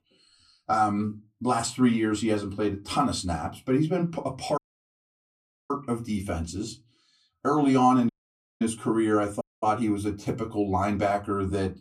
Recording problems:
off-mic speech; far
room echo; very slight; dies away in 0.2 s
audio cutting out; at 4.5 s for 1 s, at 8 s for 0.5 s and at 9.5 s

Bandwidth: 14 kHz